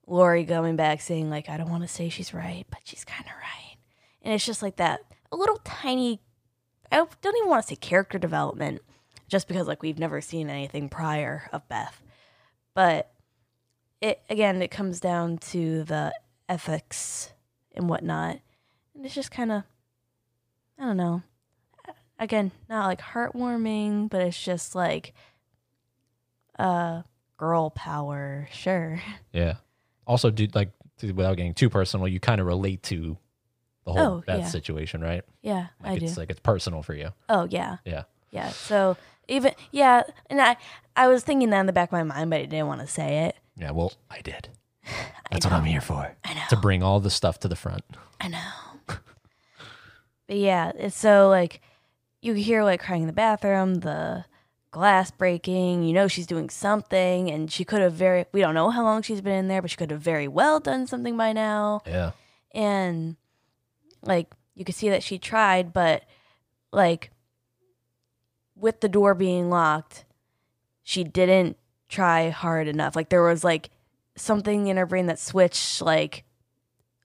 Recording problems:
none

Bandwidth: 15 kHz